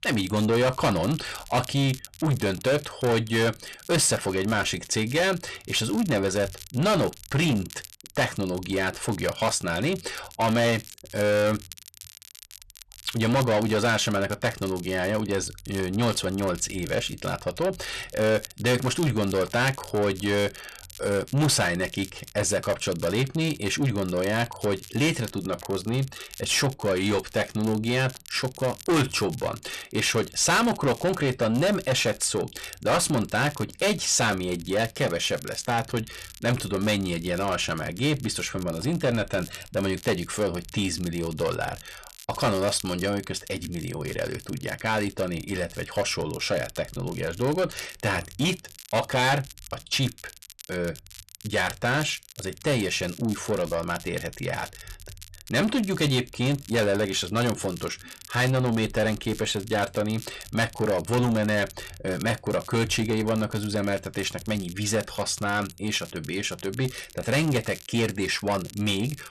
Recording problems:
distortion; heavy; 6 dB below the speech
crackle, like an old record; noticeable; 20 dB below the speech

